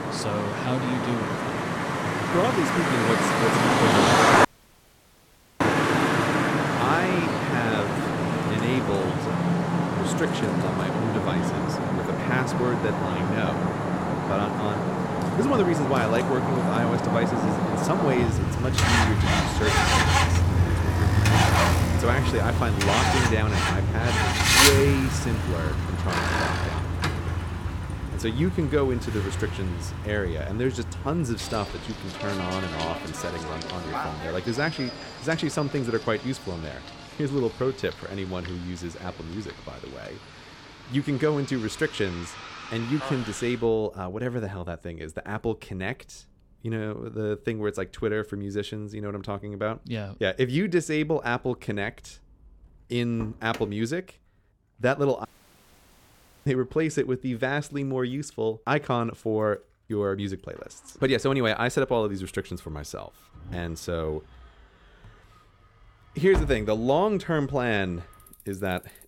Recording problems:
traffic noise; very loud; throughout; 4 dB above the speech
audio cutting out; at 4.5 s for 1 s and at 55 s for 1 s

